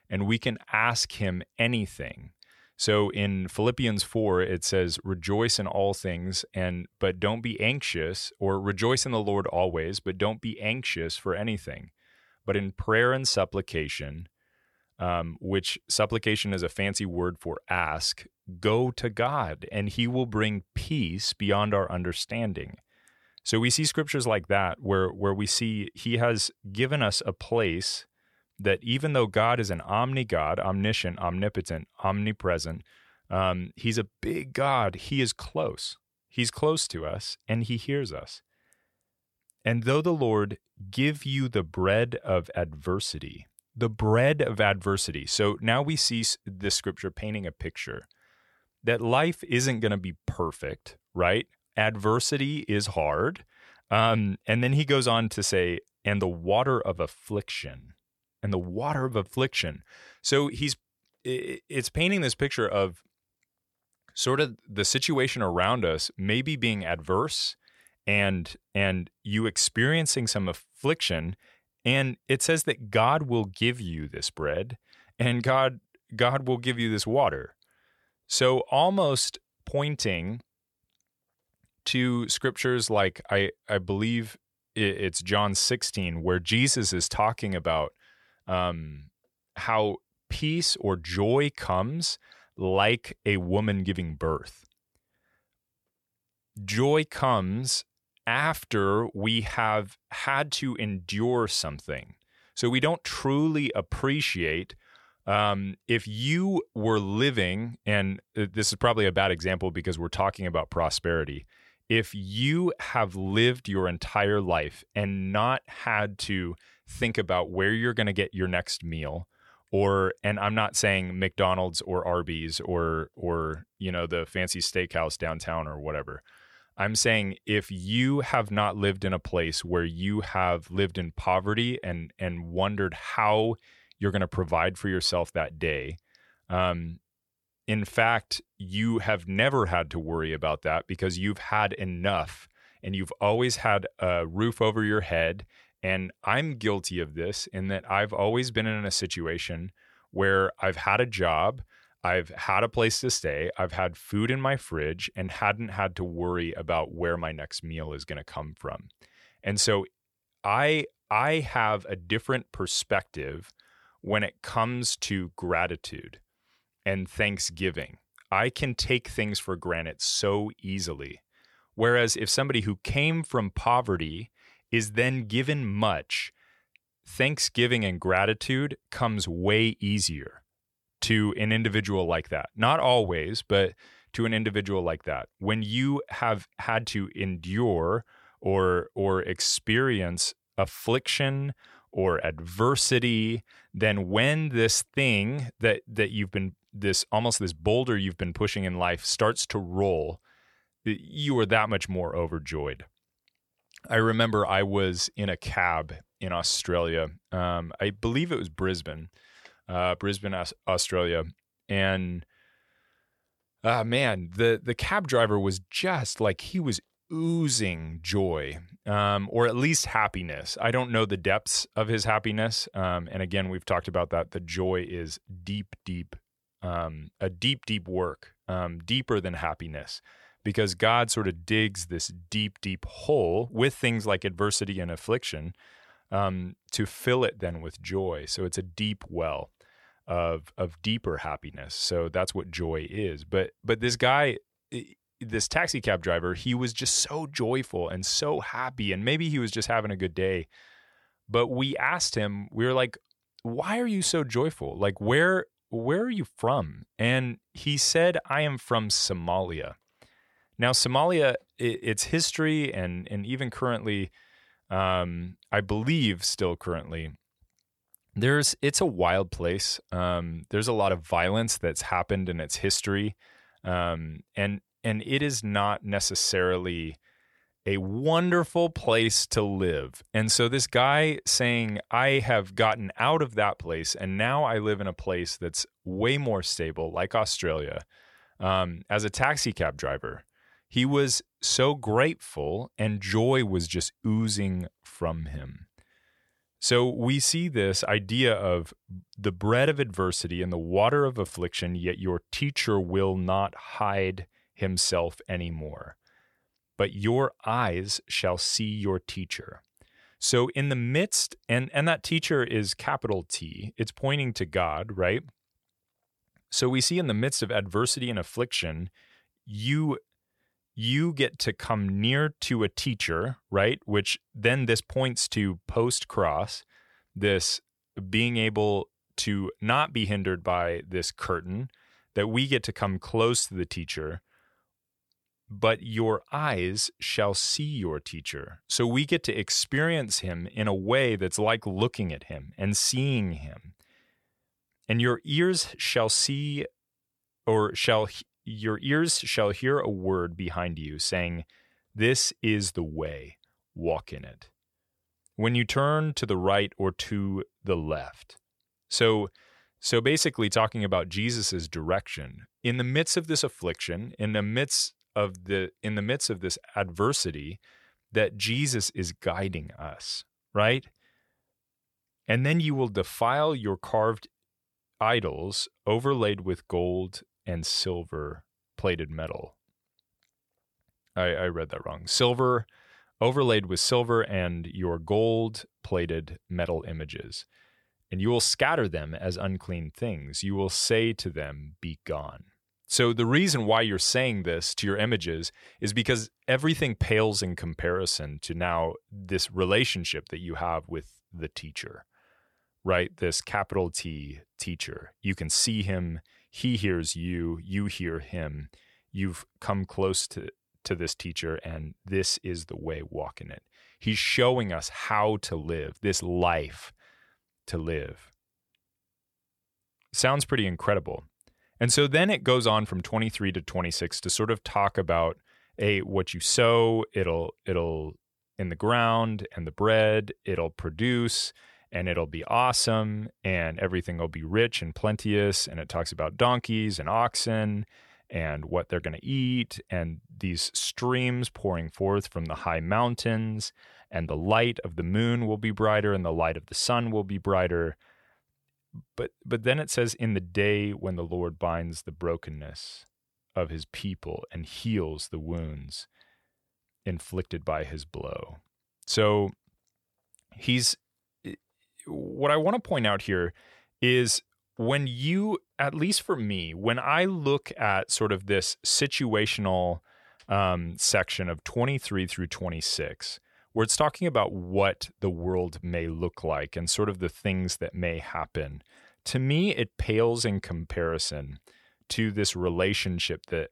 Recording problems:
none

